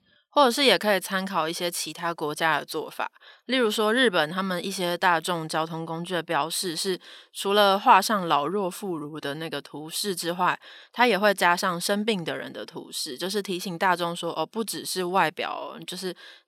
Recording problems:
none

